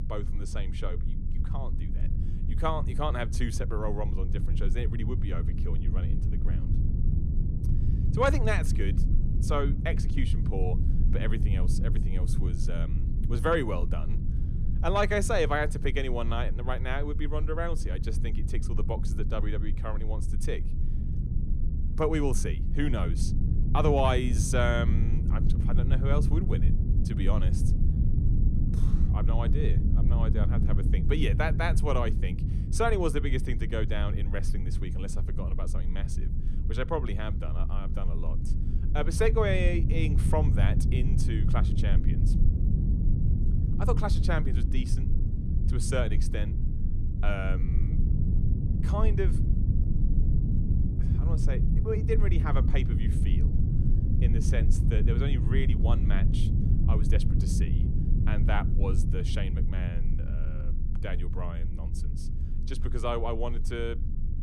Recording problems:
low rumble; loud; throughout; 9 dB below the speech

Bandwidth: 14.5 kHz